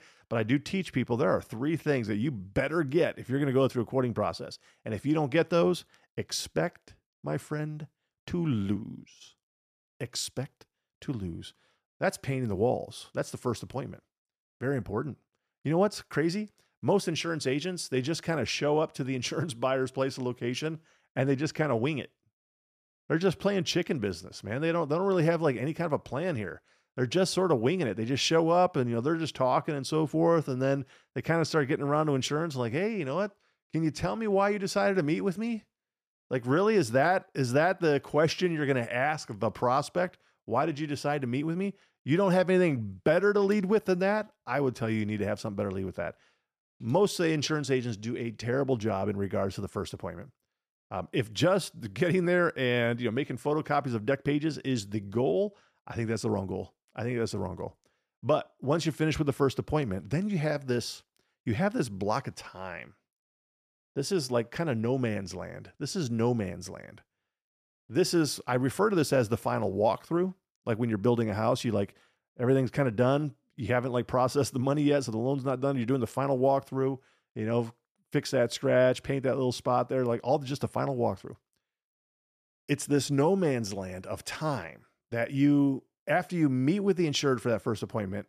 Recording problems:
none

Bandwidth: 14.5 kHz